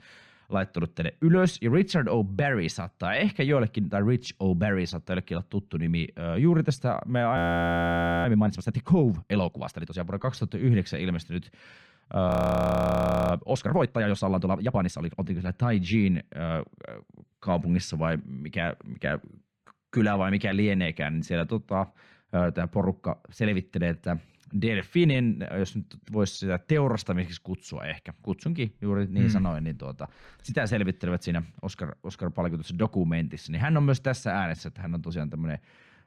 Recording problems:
muffled; slightly; fading above 3 kHz
audio freezing; at 7.5 s for 1 s and at 12 s for 1 s

